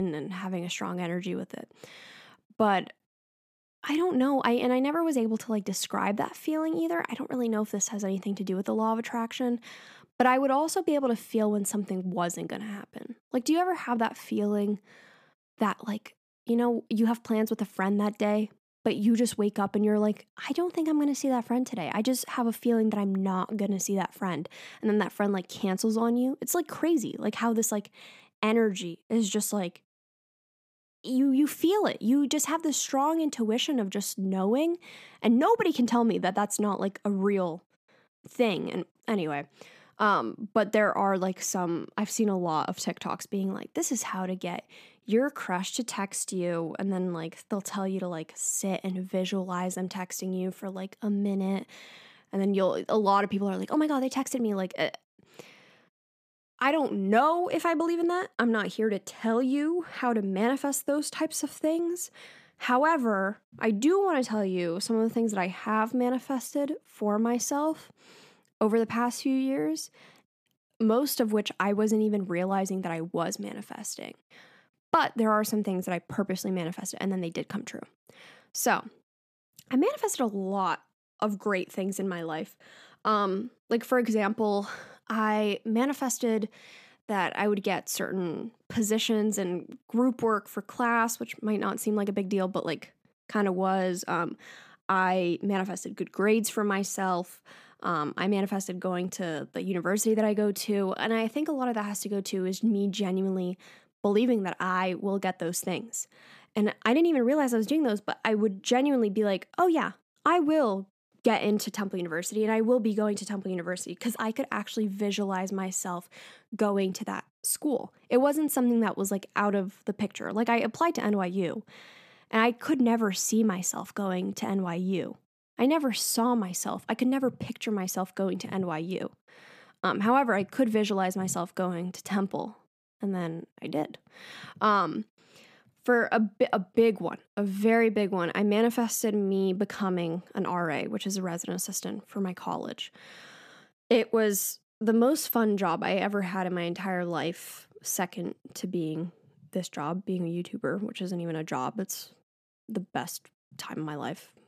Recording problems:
abrupt cut into speech; at the start

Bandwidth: 14.5 kHz